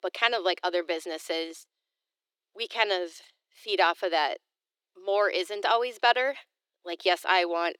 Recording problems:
thin; very; fading below 350 Hz

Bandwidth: 18 kHz